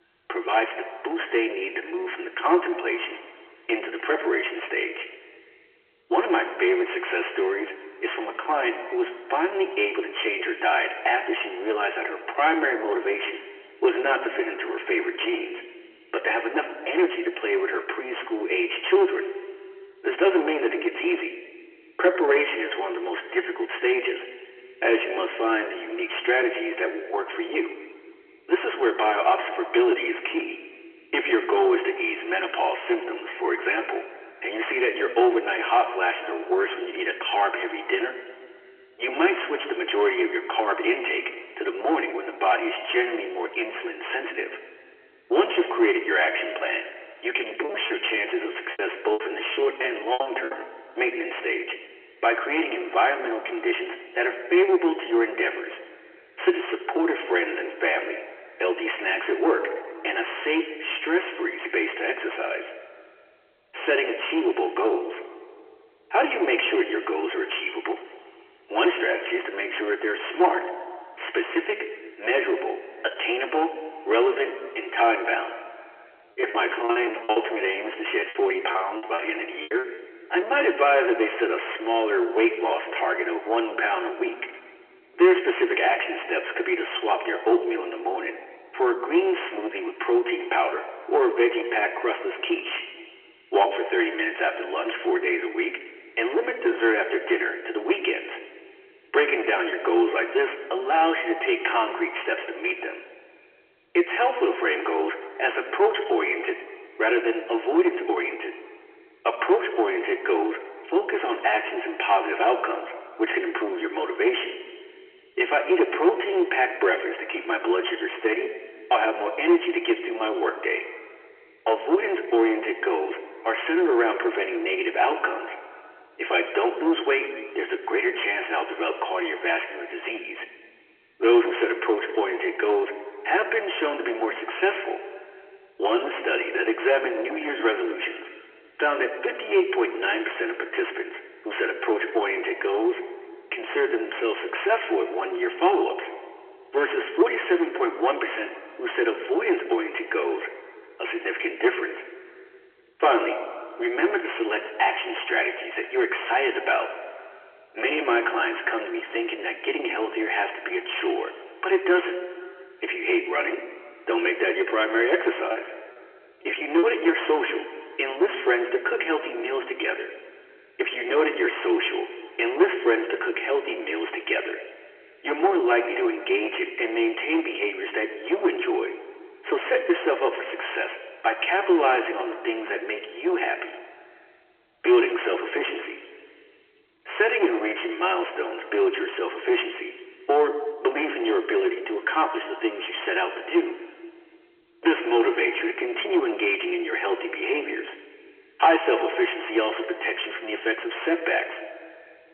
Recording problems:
room echo; slight; dies away in 1.7 s
phone-call audio; nothing above 3 kHz
distortion; slight; 10 dB below the speech
off-mic speech; somewhat distant
choppy; very; from 48 to 51 s, from 1:16 to 1:20 and from 2:45 to 2:47; 21% of the speech affected

